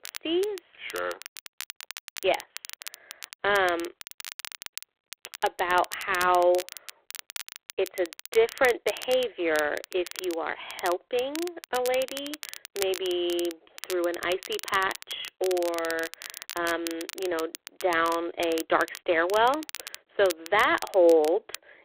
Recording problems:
phone-call audio; poor line
crackle, like an old record; noticeable; 15 dB below the speech

